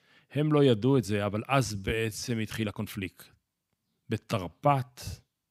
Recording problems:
uneven, jittery; strongly; from 1 to 5 s

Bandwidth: 15.5 kHz